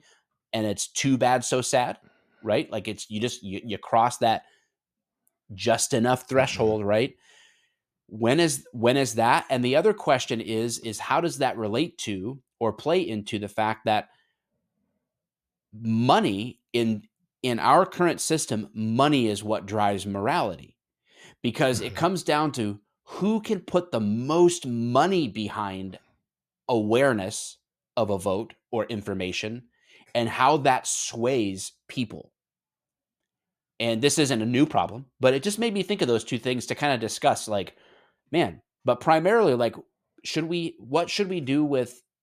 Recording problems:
none

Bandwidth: 14.5 kHz